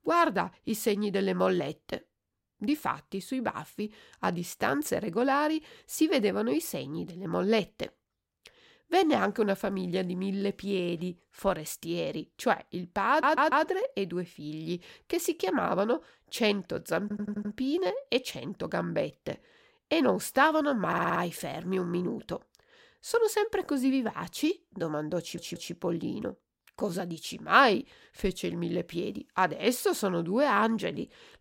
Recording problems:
audio stuttering; 4 times, first at 13 s

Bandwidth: 16 kHz